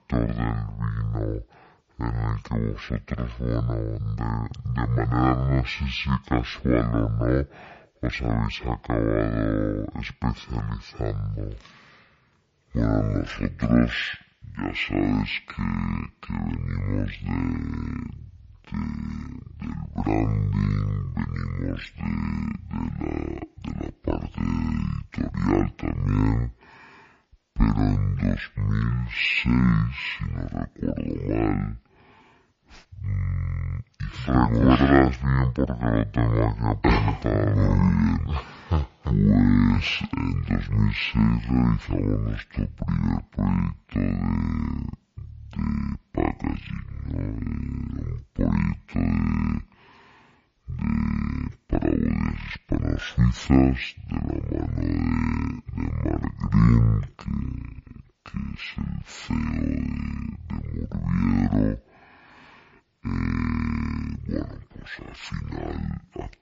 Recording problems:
wrong speed and pitch; too slow and too low; 0.5 times normal speed

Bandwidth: 7.5 kHz